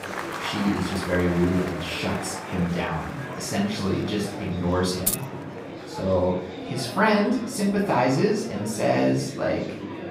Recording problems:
off-mic speech; far
room echo; noticeable; dies away in 0.5 s
murmuring crowd; loud; throughout; 9 dB below the speech
jangling keys; noticeable; at 5 s; peak level with the speech

